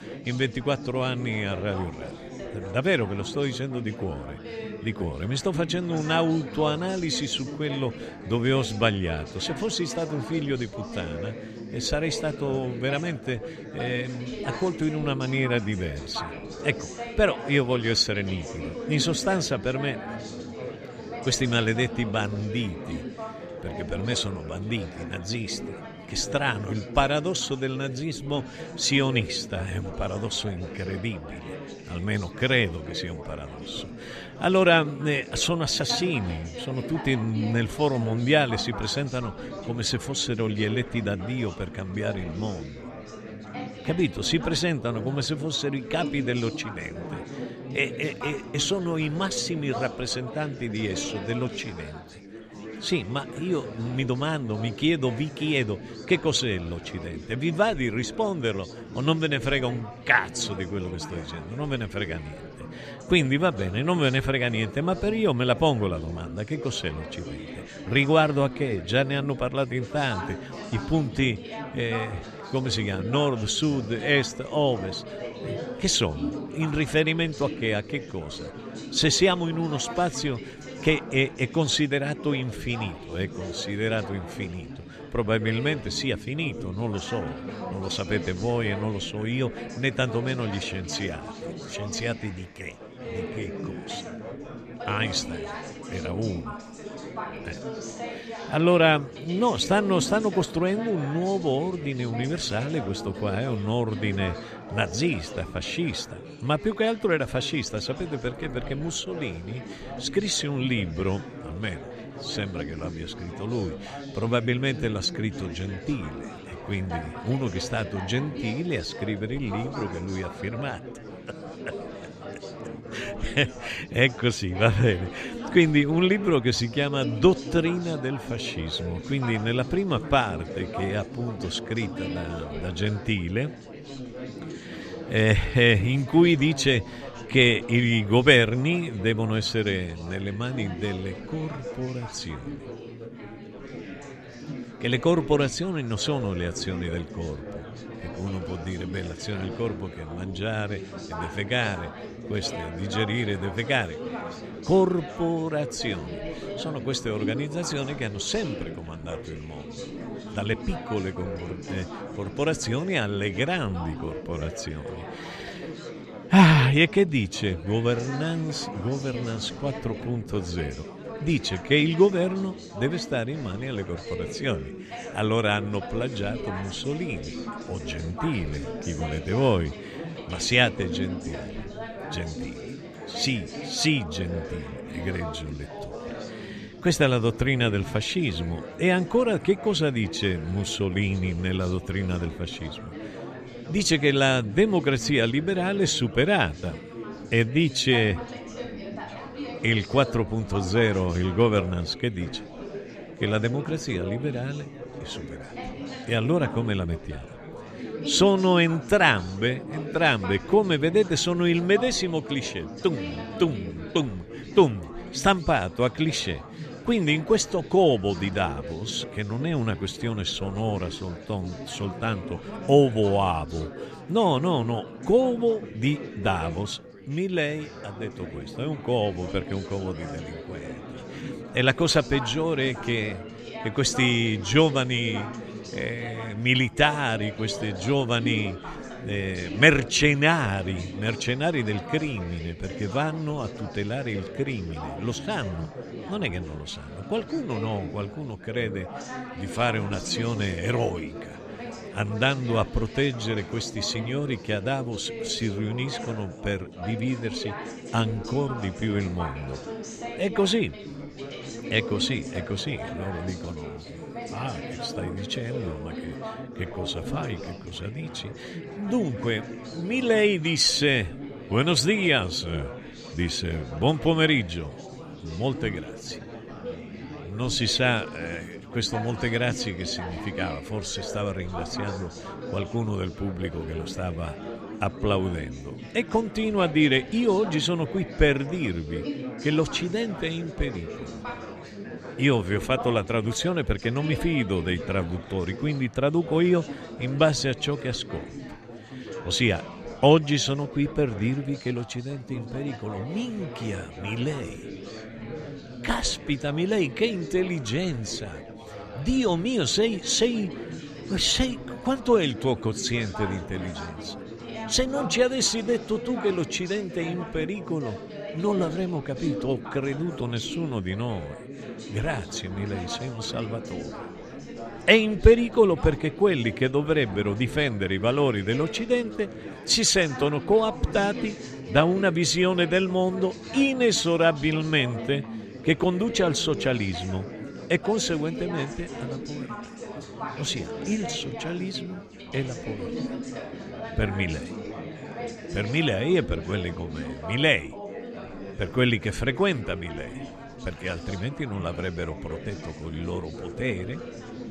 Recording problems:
chatter from many people; noticeable; throughout; 10 dB below the speech

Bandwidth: 14 kHz